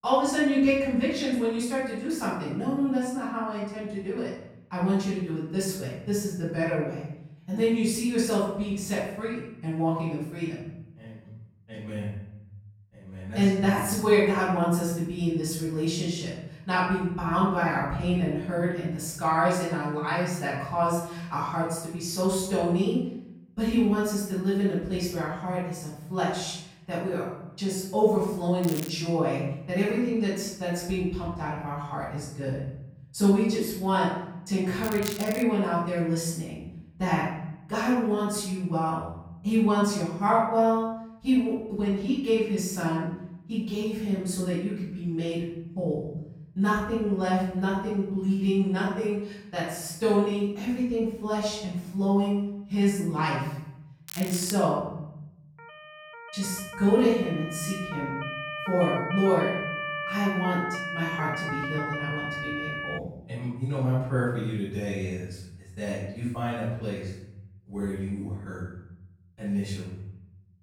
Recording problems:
off-mic speech; far
room echo; noticeable; dies away in 0.9 s
crackling; noticeable; at 29 s, at 35 s and at 54 s; 10 dB below the speech
siren; noticeable; from 56 s to 1:03; peak 3 dB below the speech

